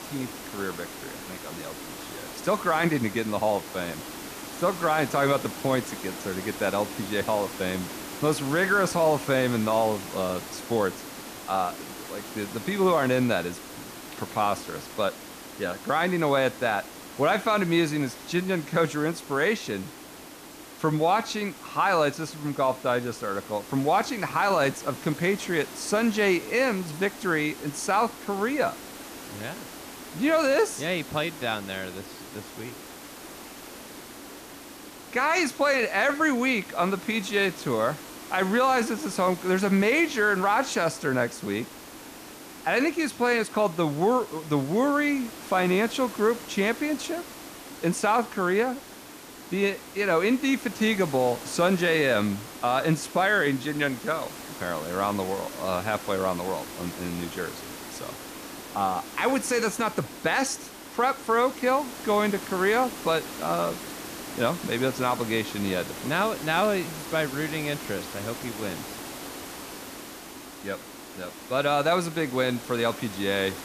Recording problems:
hiss; noticeable; throughout; 15 dB below the speech

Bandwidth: 14.5 kHz